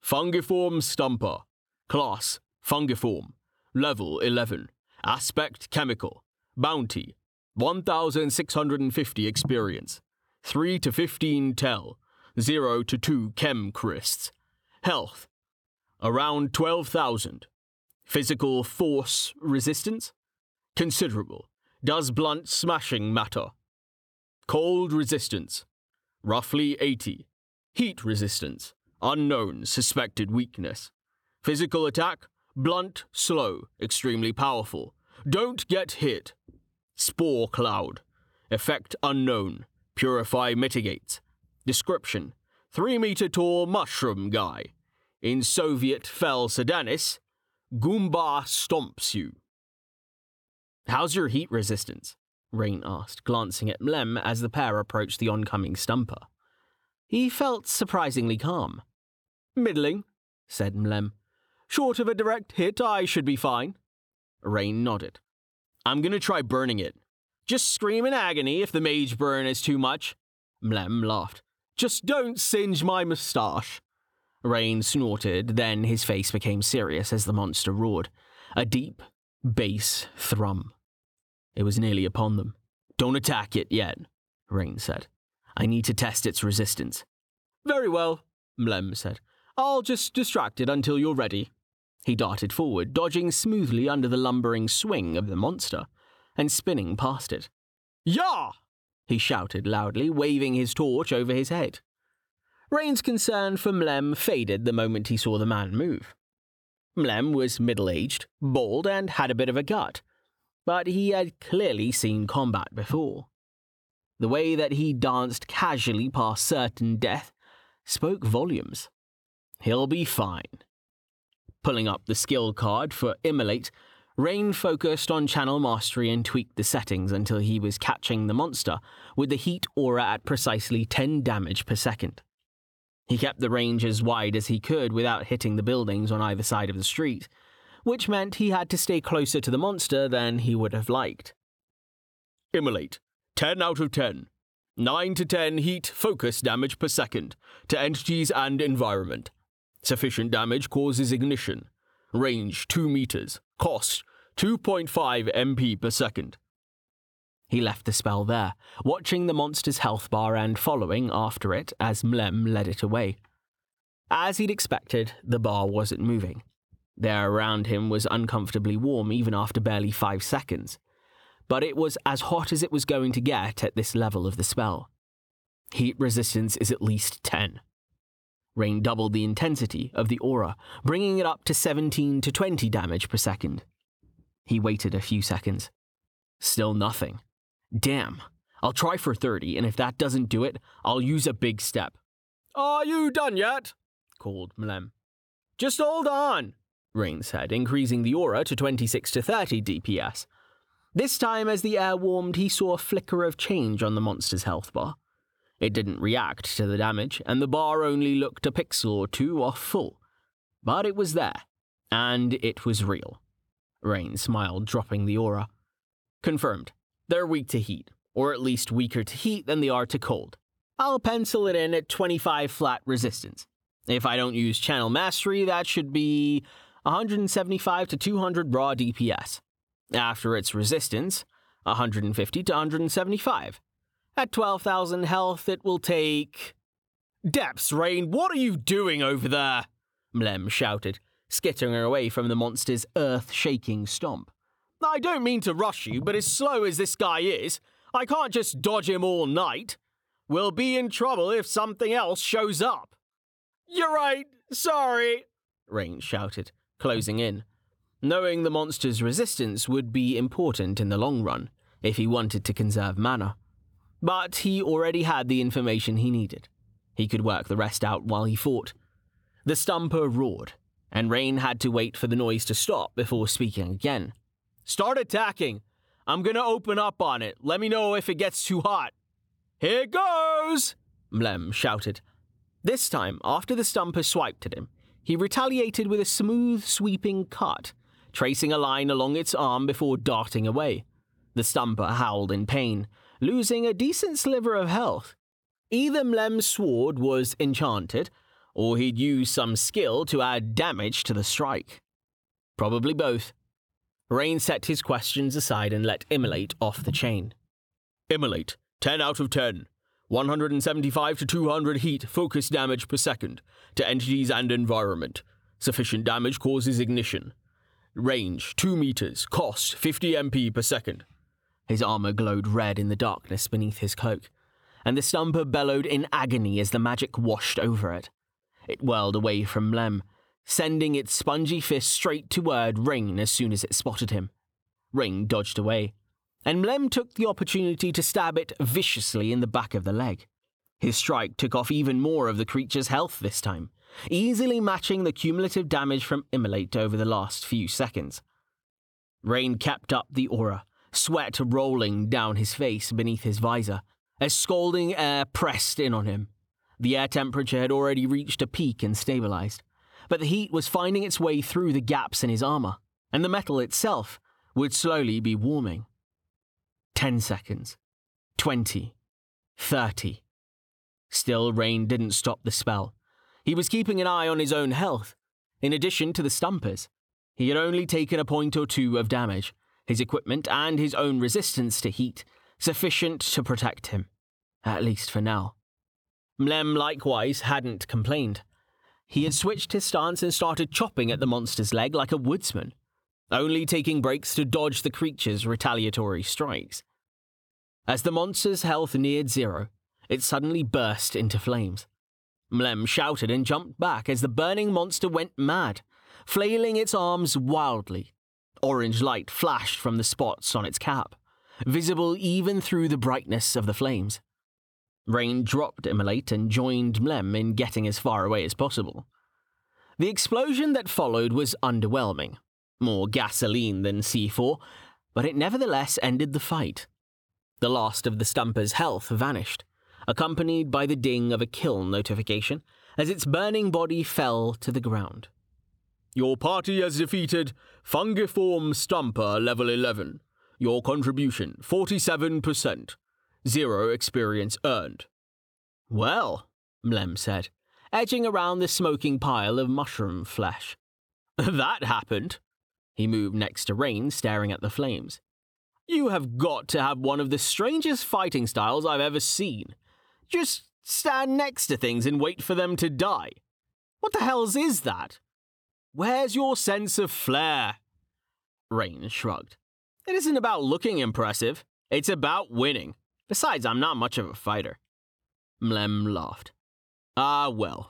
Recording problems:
squashed, flat; somewhat

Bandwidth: 18.5 kHz